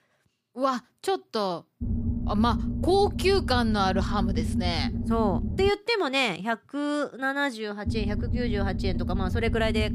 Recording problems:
low rumble; noticeable; from 2 to 5.5 s and from 8 s on; 10 dB below the speech

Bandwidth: 15 kHz